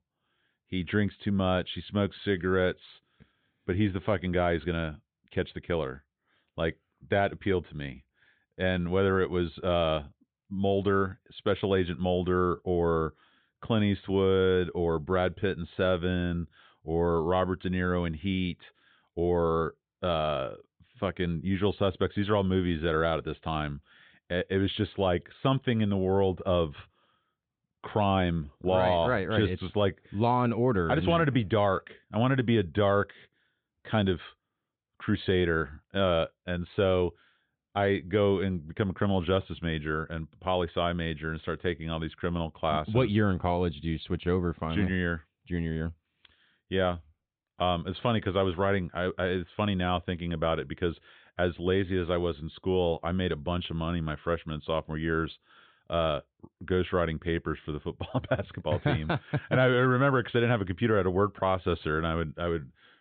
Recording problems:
high frequencies cut off; severe; nothing above 4 kHz

